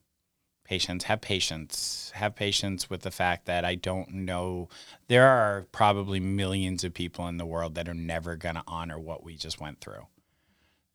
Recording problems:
none

